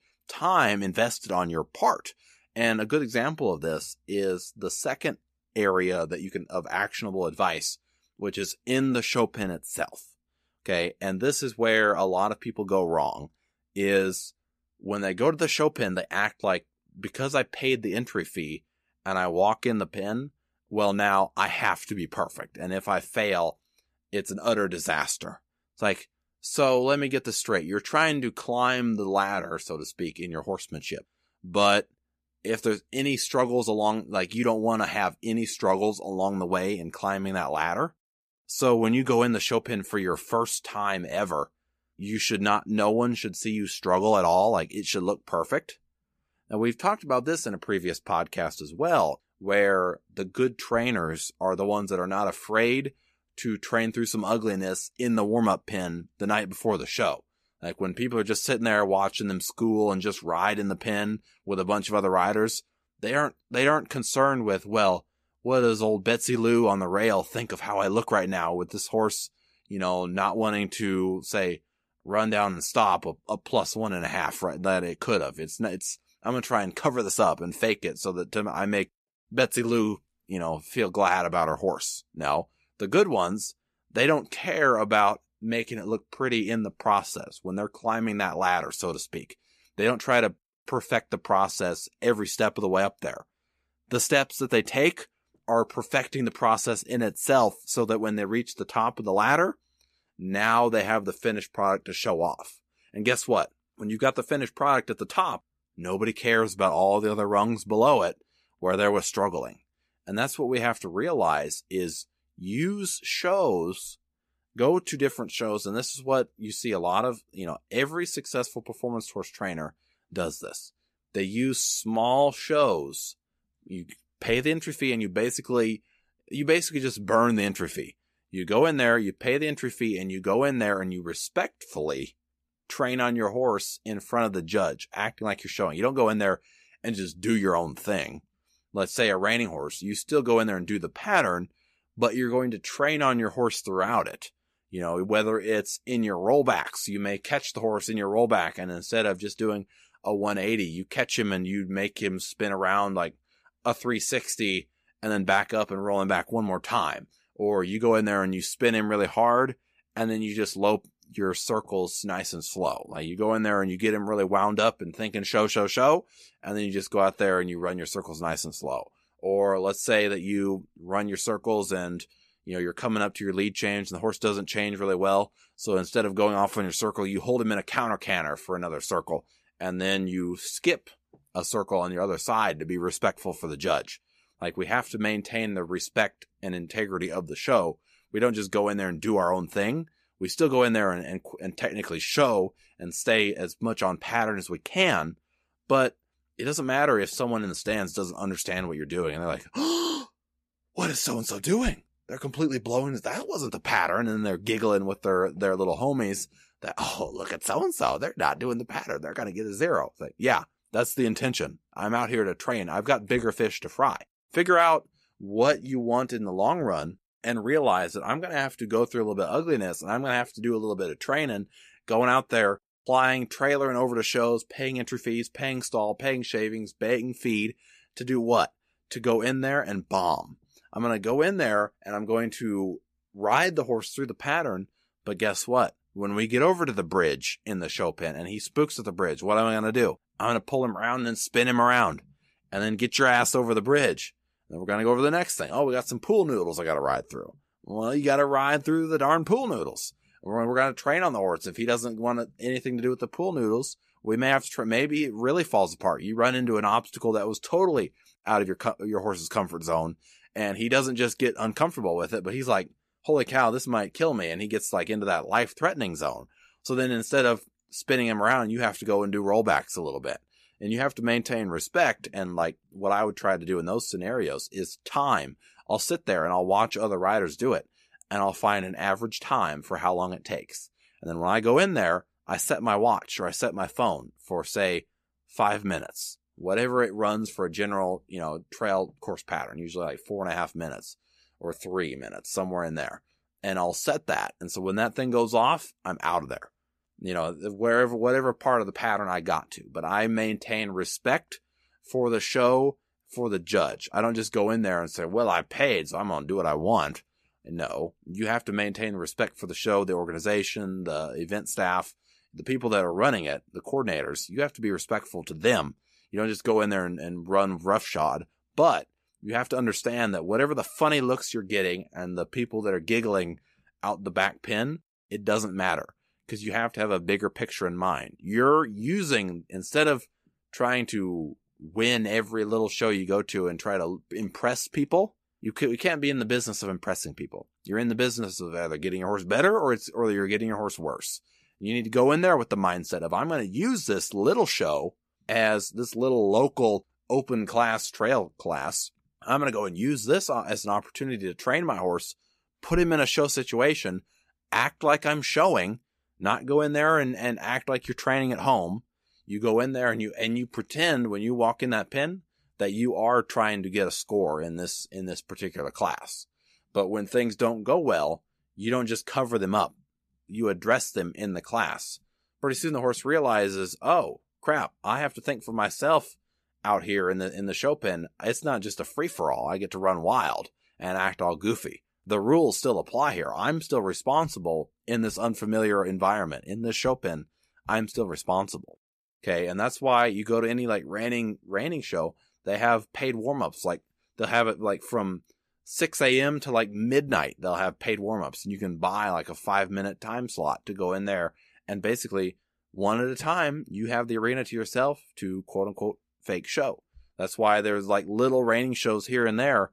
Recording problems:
none

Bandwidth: 14.5 kHz